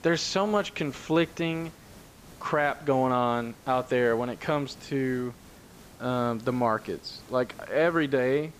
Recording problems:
high frequencies cut off; noticeable; nothing above 8 kHz
hiss; faint; throughout; 20 dB below the speech

